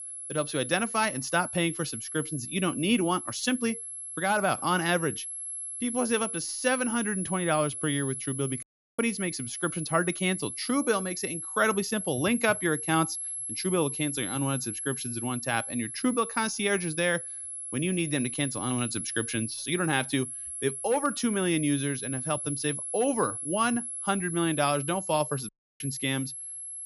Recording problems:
high-pitched whine; loud; throughout; 11 kHz, 5 dB below the speech
audio cutting out; at 8.5 s and at 25 s

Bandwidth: 16 kHz